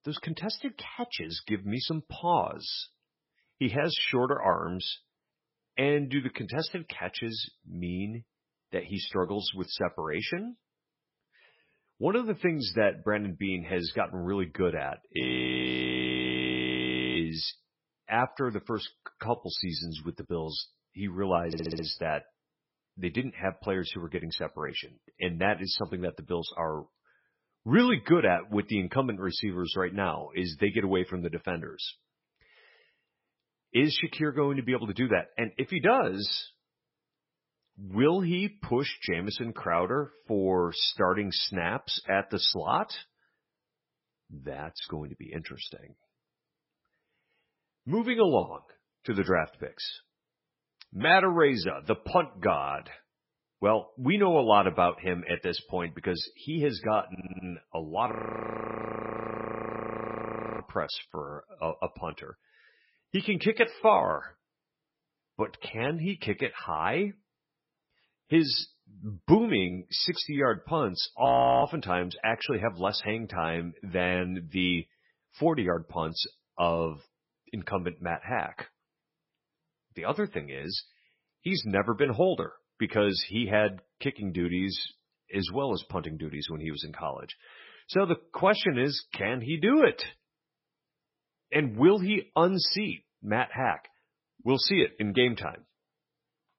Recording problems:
garbled, watery; badly; nothing above 5.5 kHz
audio freezing; at 15 s for 2 s, at 58 s for 2.5 s and at 1:11
audio stuttering; at 21 s and at 57 s

